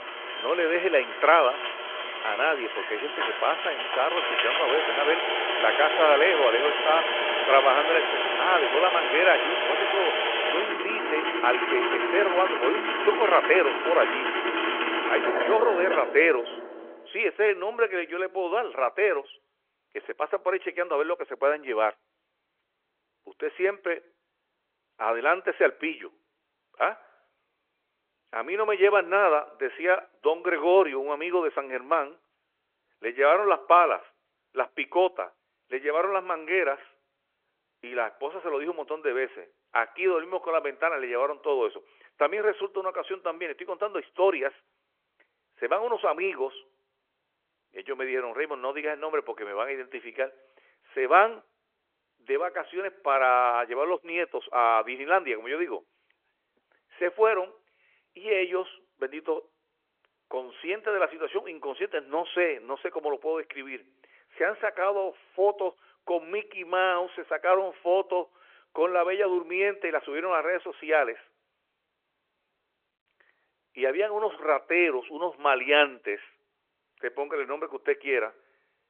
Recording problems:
phone-call audio
traffic noise; loud; until 17 s; as loud as the speech

